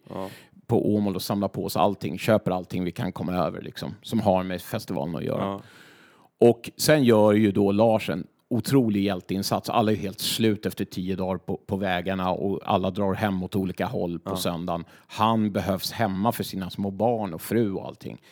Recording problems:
none

